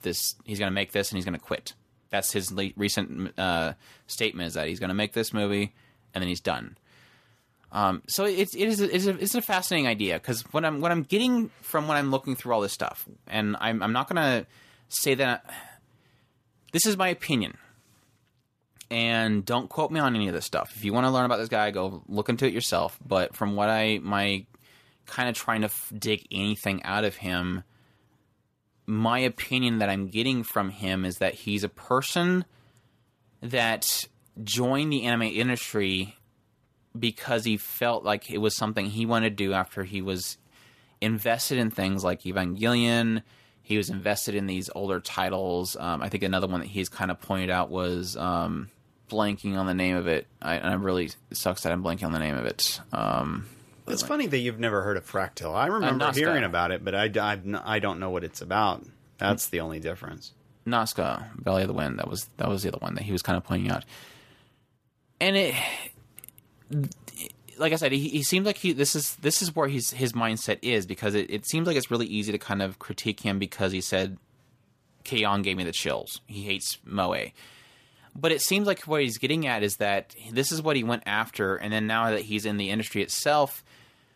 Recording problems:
none

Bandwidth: 14.5 kHz